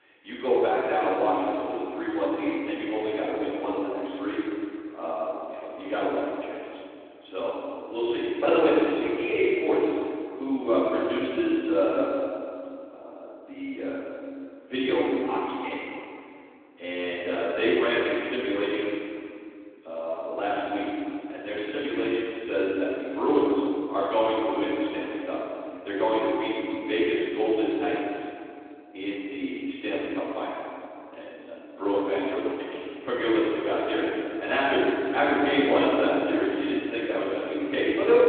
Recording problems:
room echo; strong; dies away in 2.5 s
off-mic speech; far
phone-call audio; nothing above 3.5 kHz

